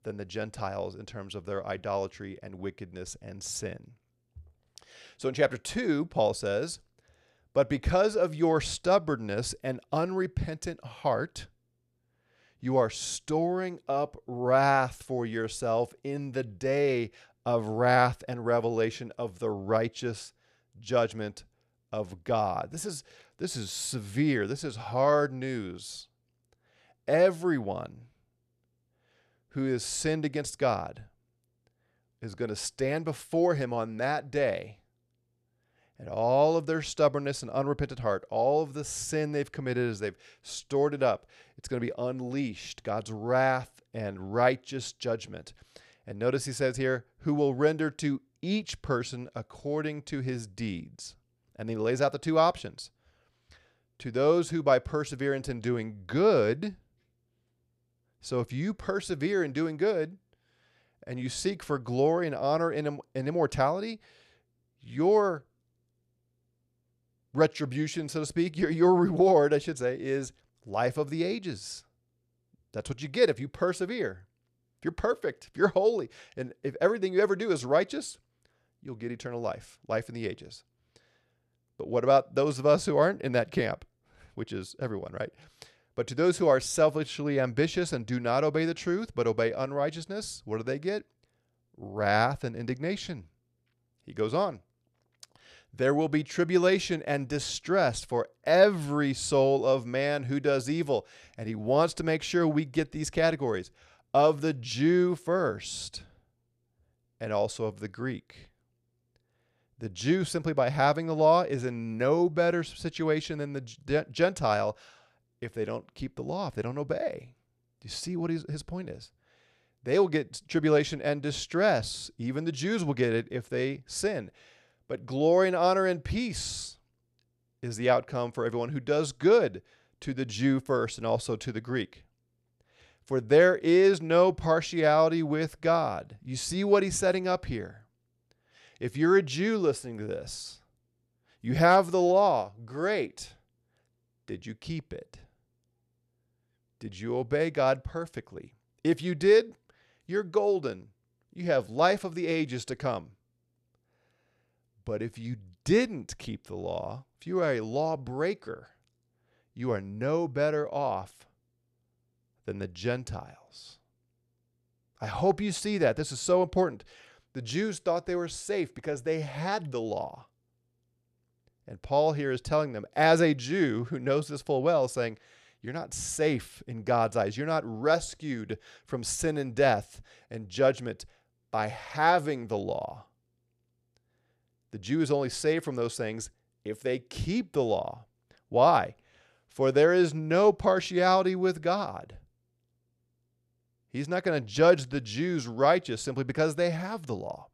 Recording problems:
none

